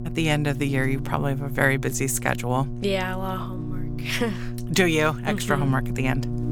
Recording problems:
electrical hum; noticeable; throughout; 60 Hz, 15 dB below the speech

